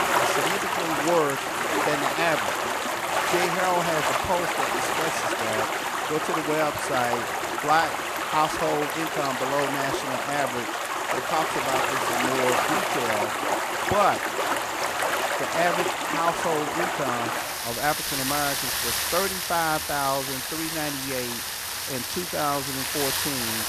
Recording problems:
rain or running water; very loud; throughout; 3 dB above the speech

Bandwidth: 14.5 kHz